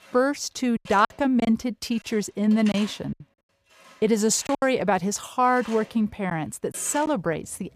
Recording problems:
machinery noise; noticeable; throughout; 20 dB below the speech
choppy; very; 6% of the speech affected

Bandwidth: 15 kHz